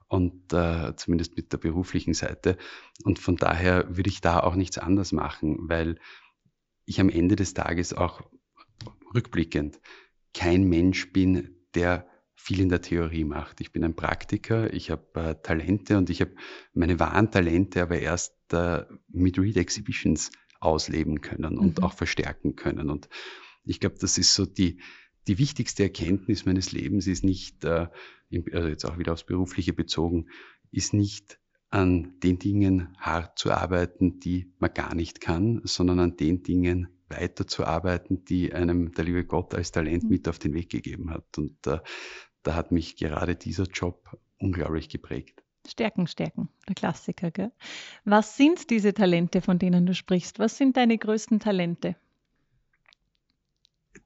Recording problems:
high frequencies cut off; noticeable; nothing above 7.5 kHz

